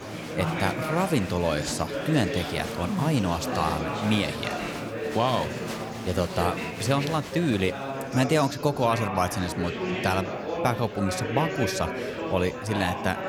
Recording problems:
murmuring crowd; loud; throughout; 4 dB below the speech

